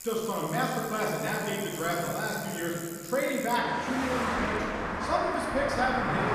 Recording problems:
off-mic speech; far
room echo; noticeable; dies away in 2.8 s
traffic noise; loud; throughout; 4 dB below the speech

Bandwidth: 14.5 kHz